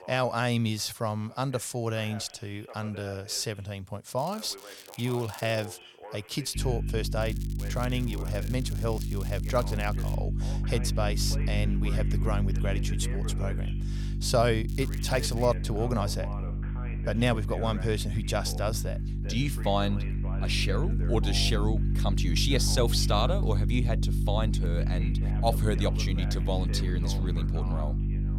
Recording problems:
electrical hum; noticeable; from 6.5 s on; 50 Hz, 10 dB below the speech
voice in the background; noticeable; throughout; 15 dB below the speech
crackling; noticeable; from 4 to 5.5 s, from 7 to 10 s and at 15 s; 15 dB below the speech

